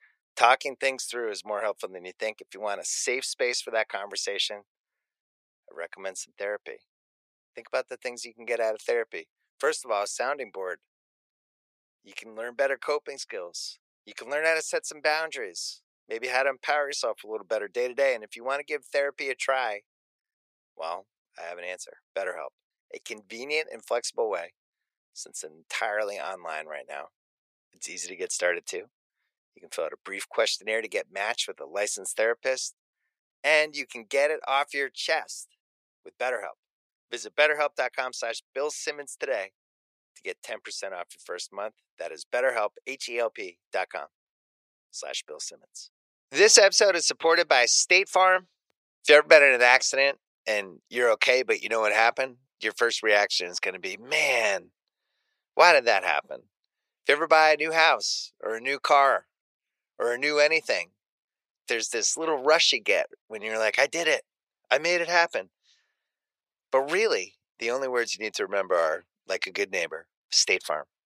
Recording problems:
thin; very; fading below 450 Hz

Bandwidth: 15 kHz